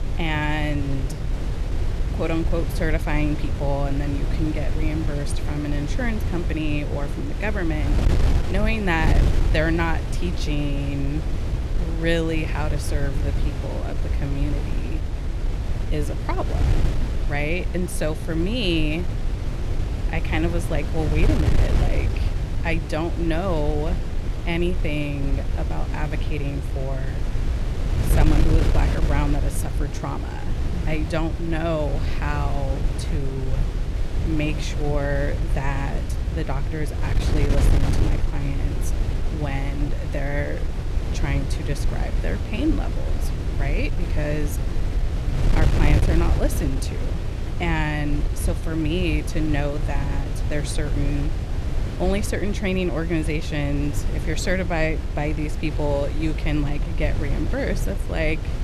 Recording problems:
wind noise on the microphone; heavy; 7 dB below the speech

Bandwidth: 13.5 kHz